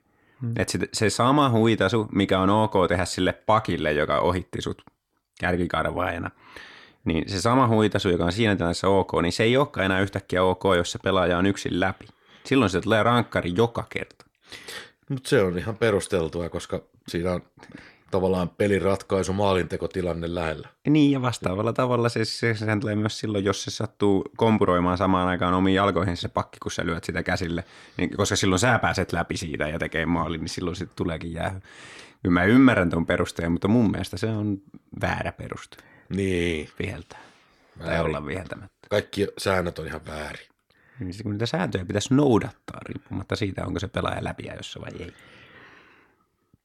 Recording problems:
none

